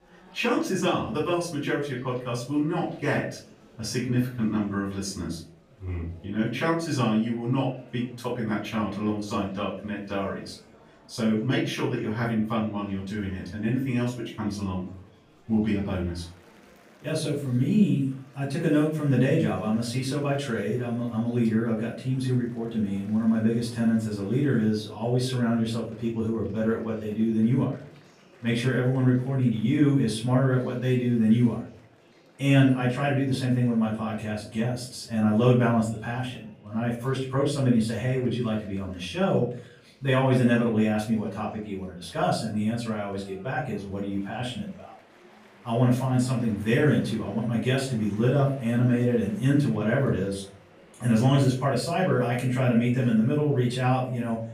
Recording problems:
off-mic speech; far
room echo; noticeable; dies away in 0.4 s
murmuring crowd; faint; throughout; 25 dB below the speech

